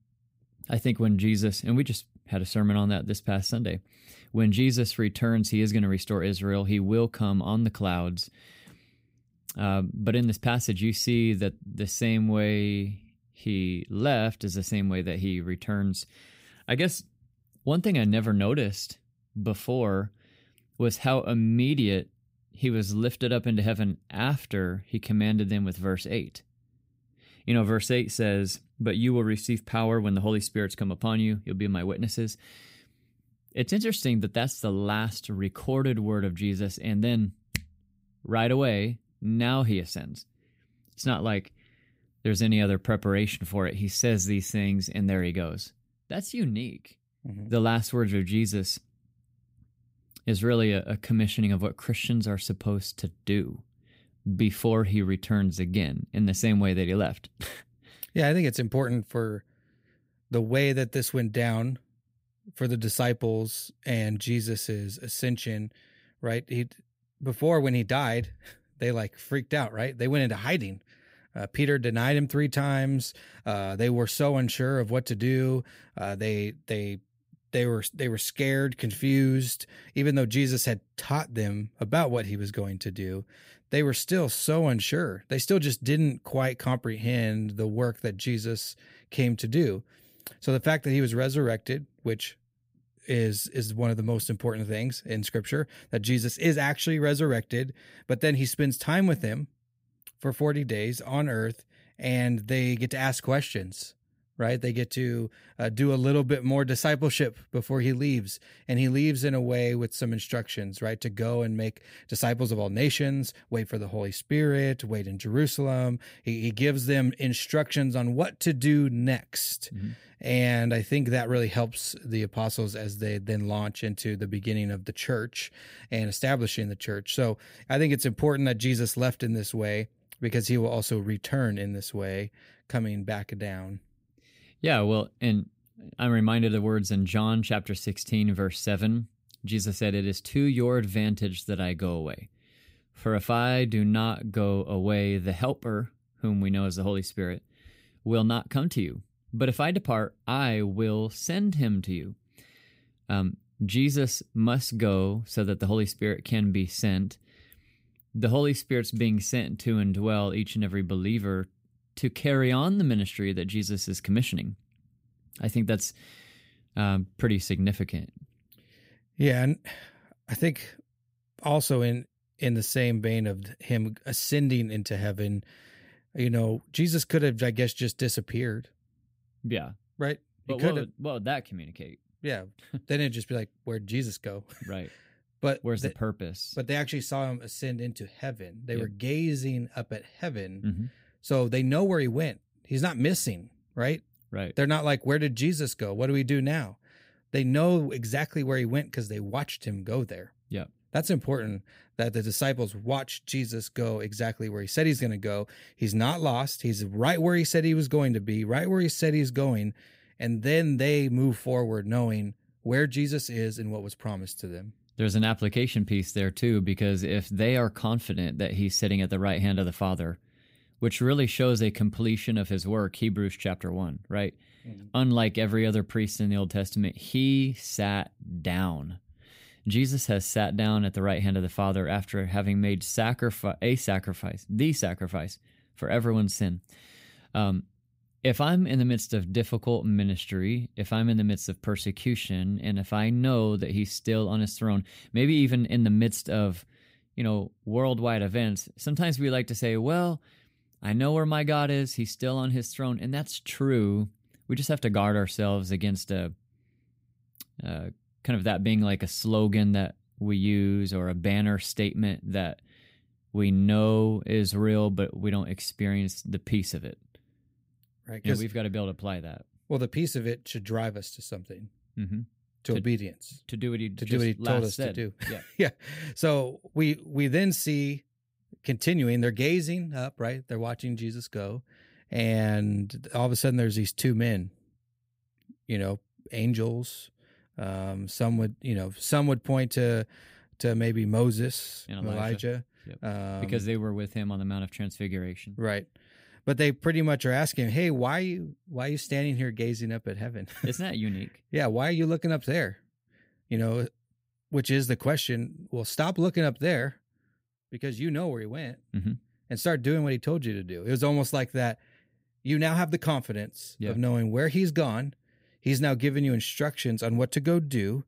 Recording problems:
none

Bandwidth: 15.5 kHz